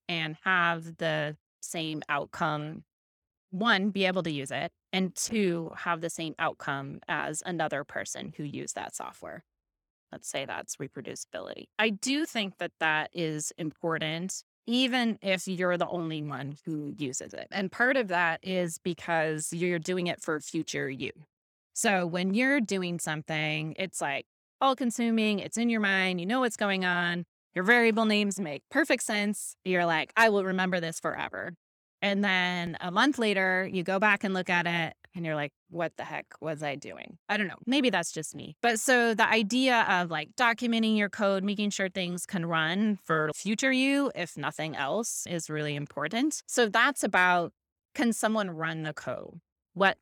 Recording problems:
none

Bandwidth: 18.5 kHz